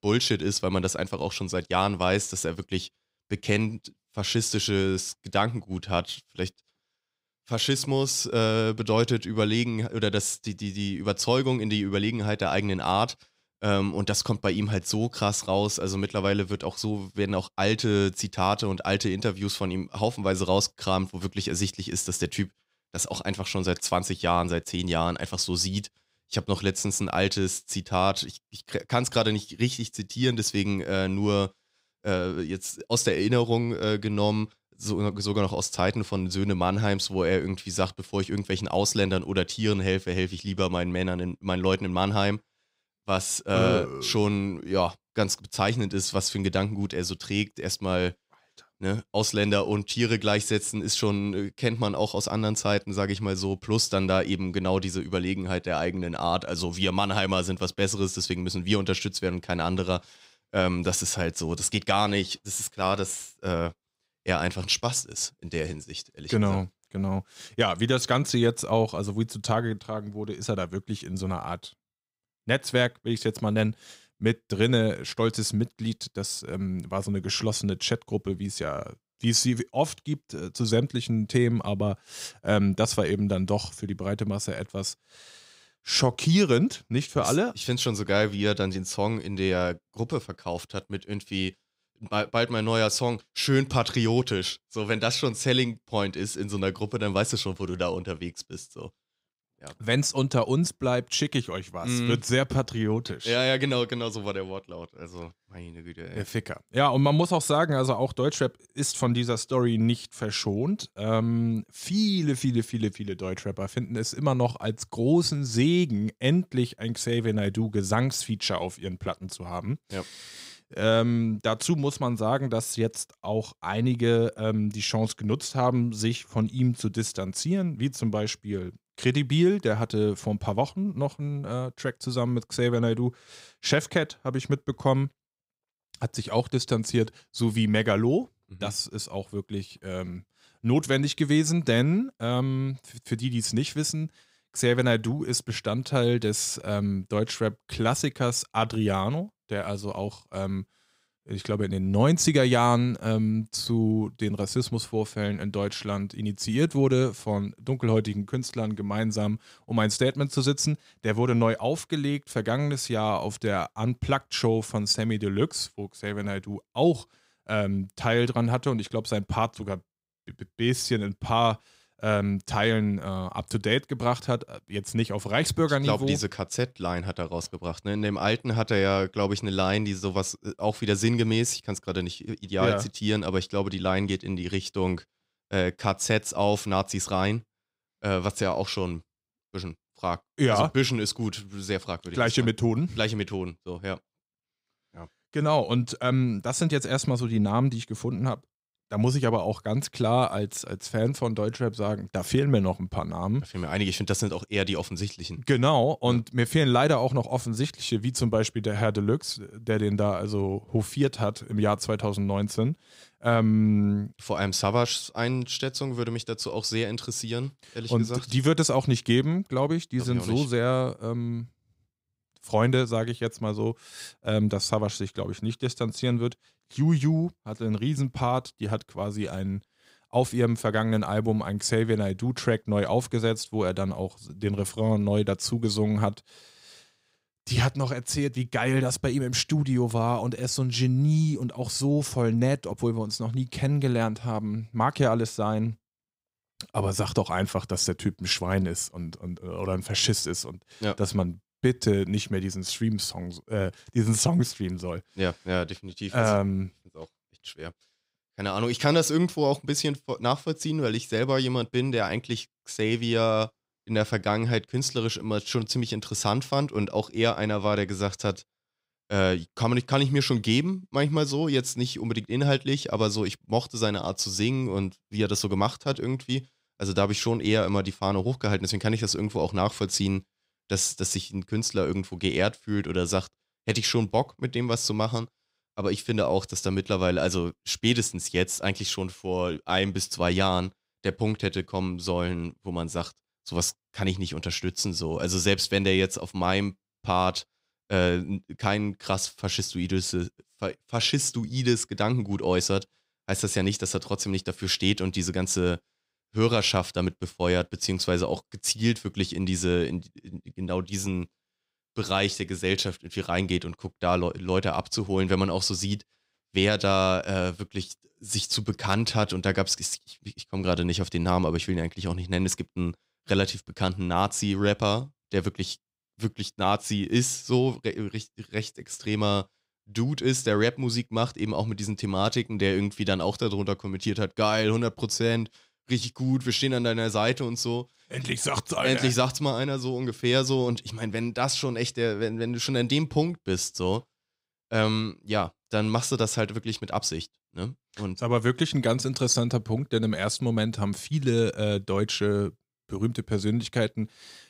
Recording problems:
none

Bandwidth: 15.5 kHz